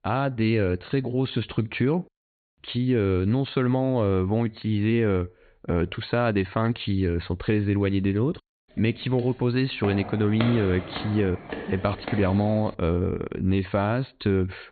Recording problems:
high frequencies cut off; severe; nothing above 4.5 kHz
footsteps; noticeable; from 9 to 13 s; peak 6 dB below the speech

